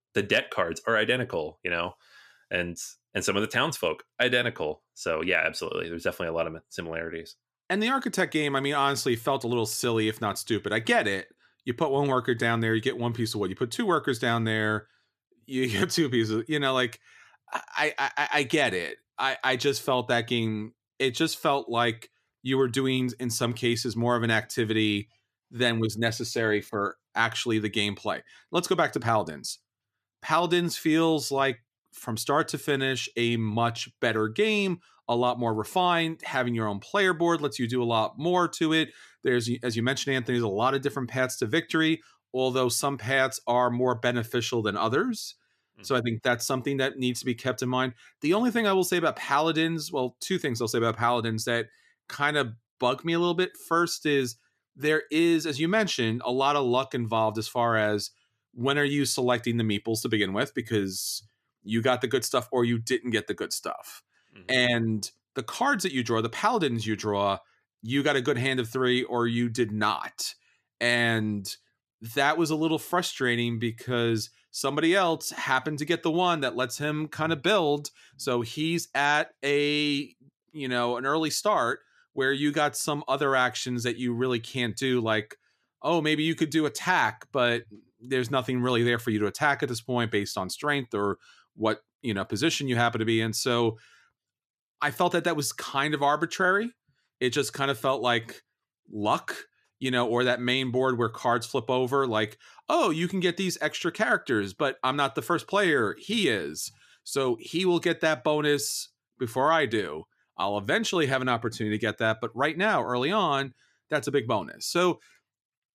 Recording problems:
none

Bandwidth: 14.5 kHz